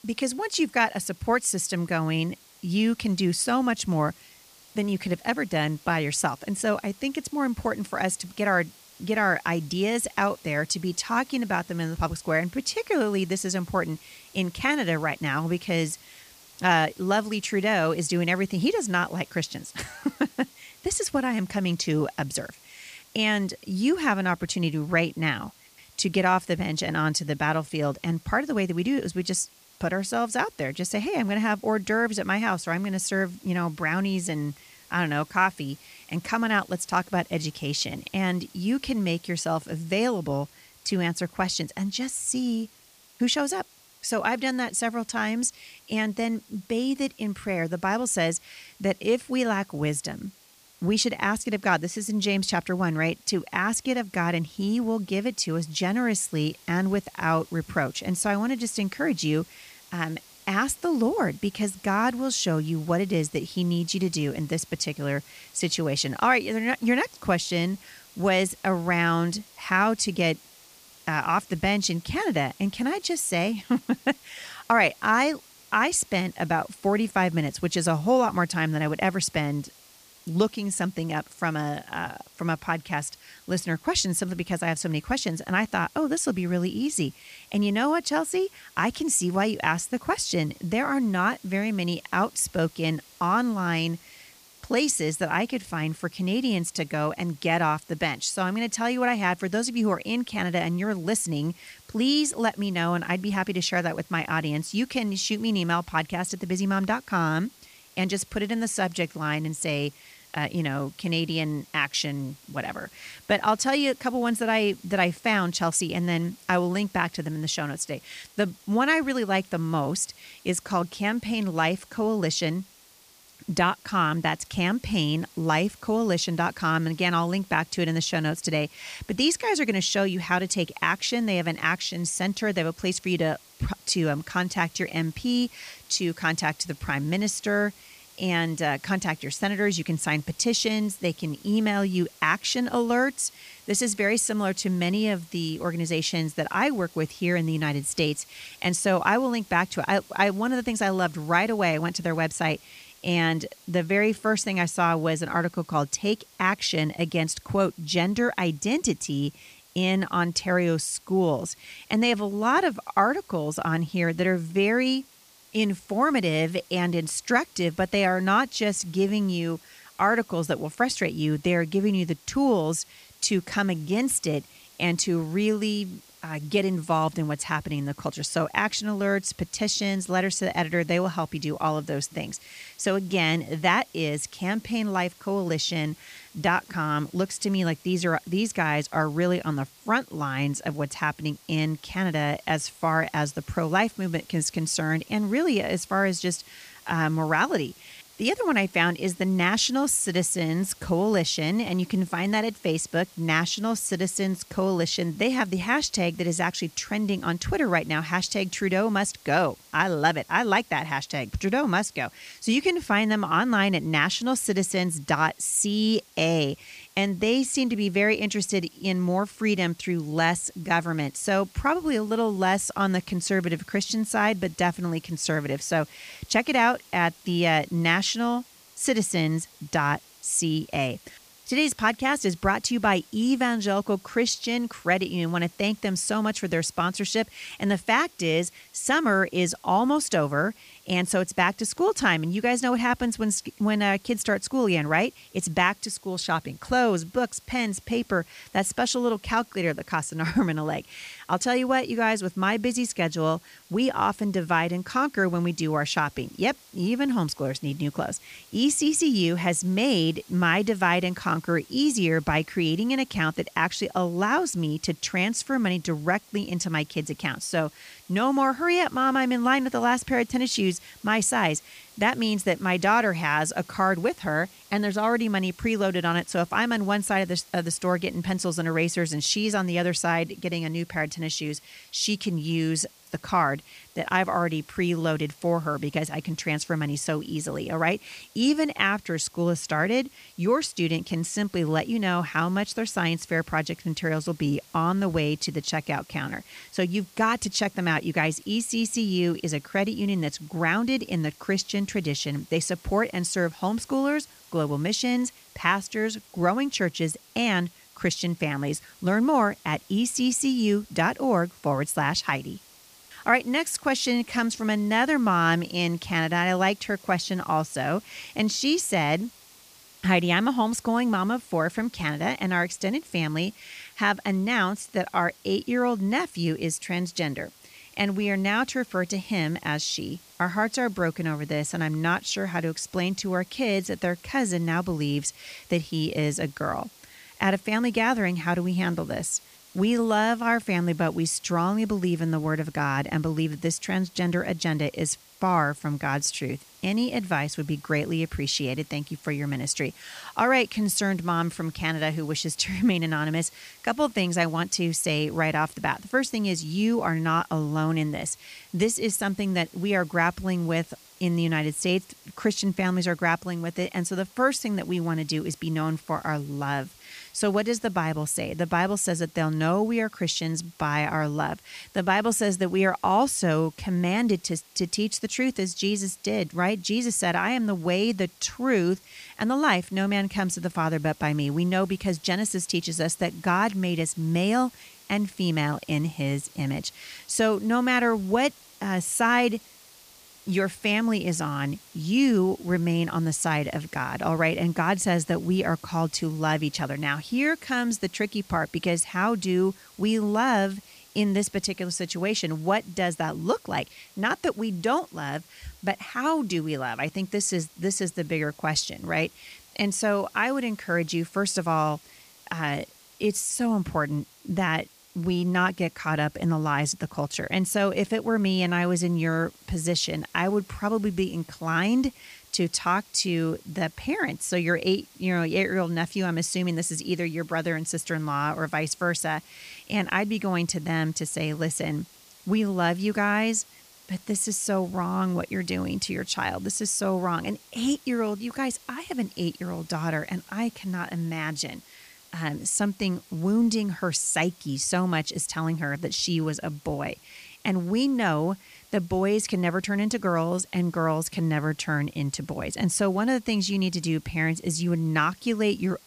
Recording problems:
hiss; faint; throughout; 25 dB below the speech

